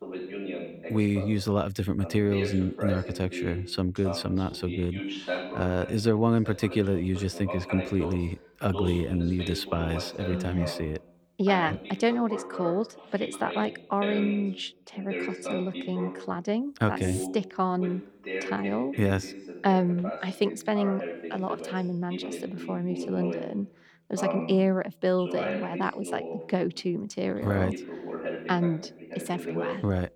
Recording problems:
voice in the background; loud; throughout; 8 dB below the speech

